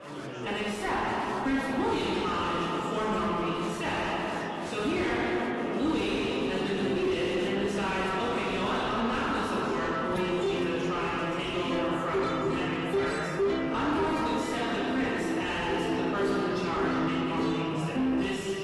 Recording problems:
distortion; heavy; 7 dB below the speech
off-mic speech; far
room echo; noticeable; dies away in 2.8 s
garbled, watery; slightly; nothing above 11.5 kHz
chatter from many people; noticeable; throughout; 10 dB below the speech
background music; very faint; from 5.5 s on; 2 dB below the speech
clattering dishes; noticeable; at 10 s; peak 6 dB below the speech

